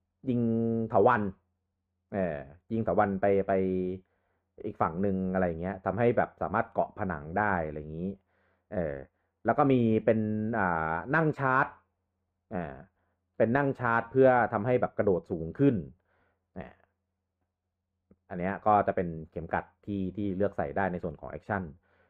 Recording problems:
muffled; very; fading above 3 kHz

